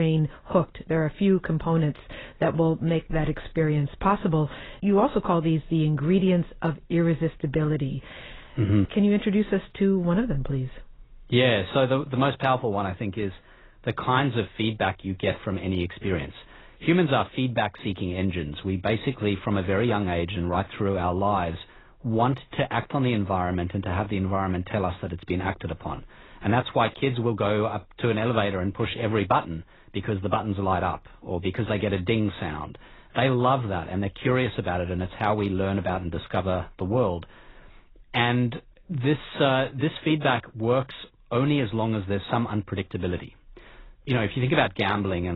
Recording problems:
garbled, watery; badly; nothing above 4 kHz
abrupt cut into speech; at the start and the end

